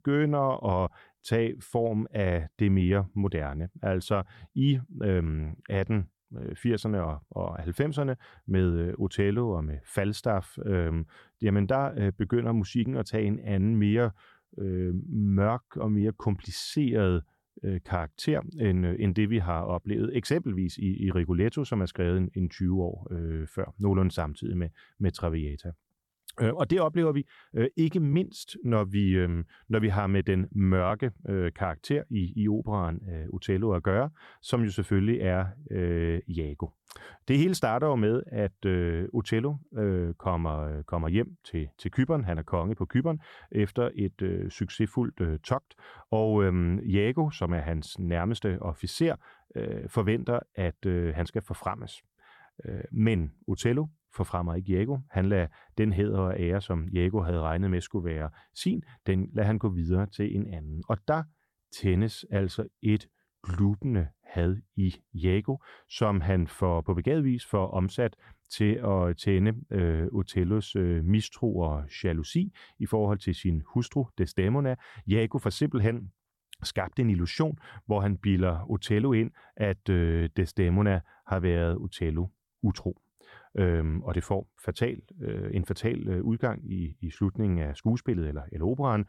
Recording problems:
none

